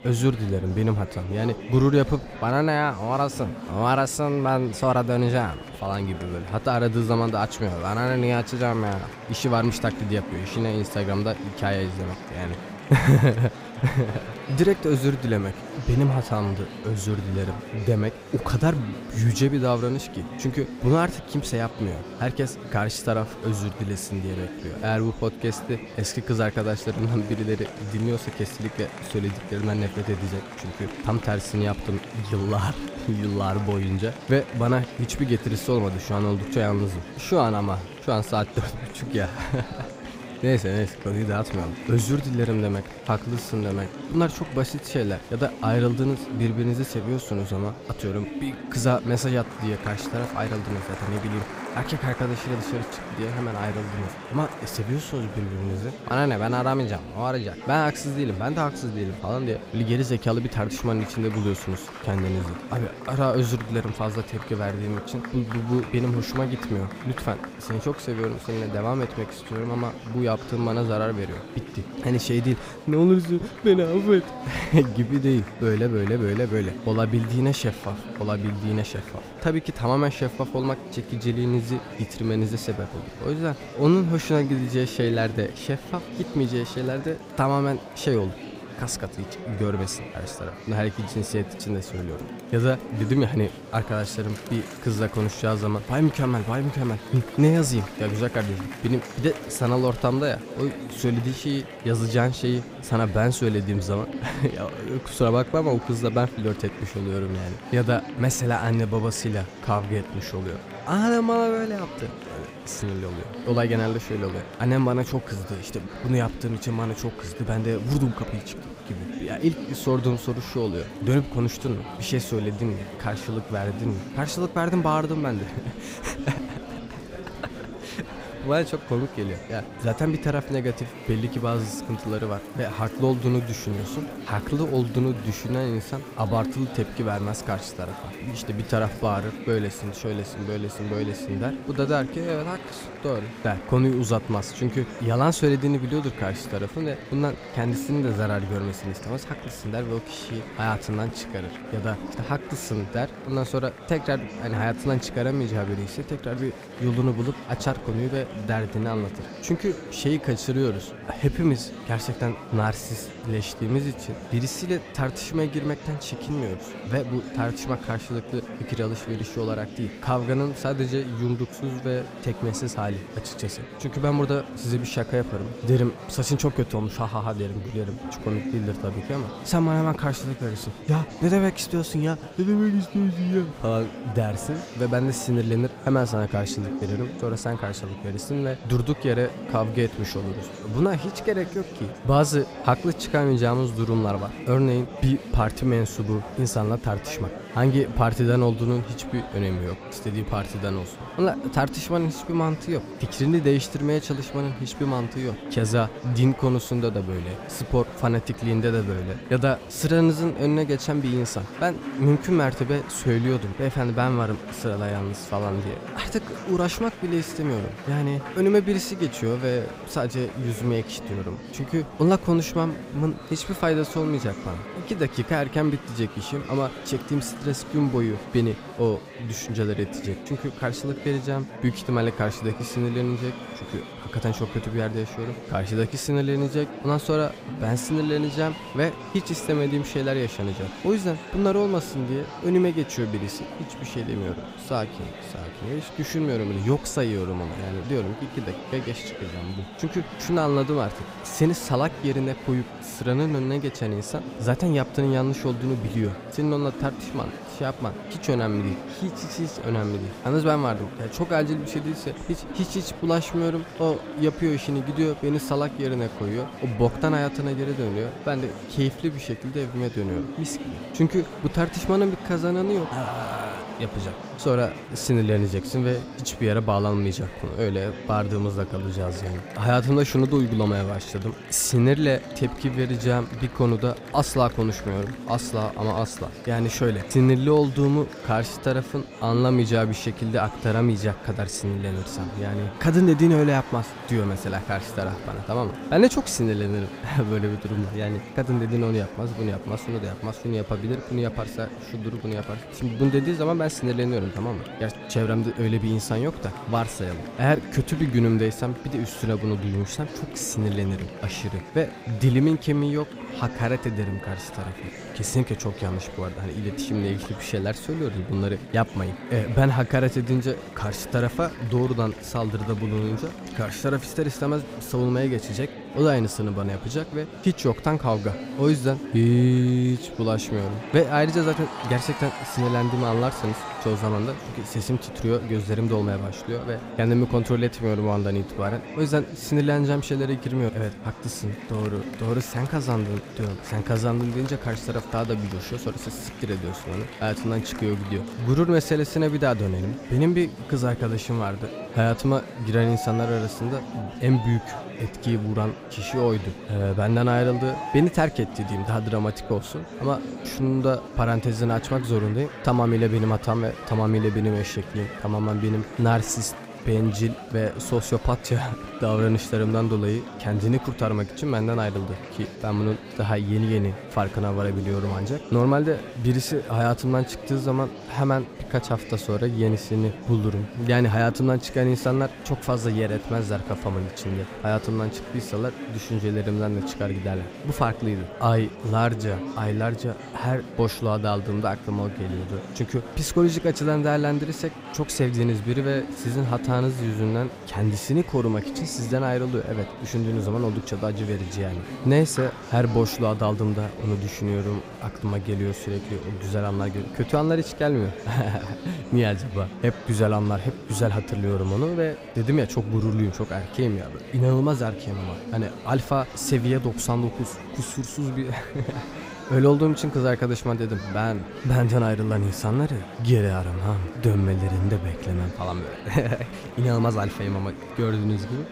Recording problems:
murmuring crowd; noticeable; throughout; 10 dB below the speech

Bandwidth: 15.5 kHz